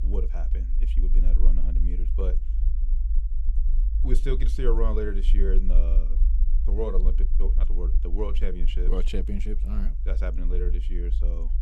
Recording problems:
low rumble; noticeable; throughout; 15 dB below the speech

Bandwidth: 14.5 kHz